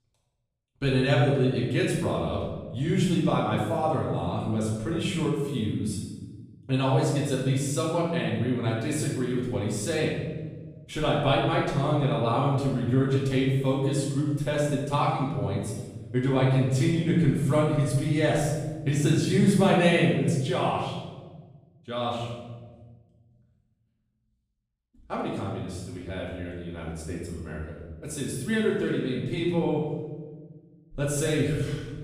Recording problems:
off-mic speech; far
room echo; noticeable; dies away in 1.2 s

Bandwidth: 15 kHz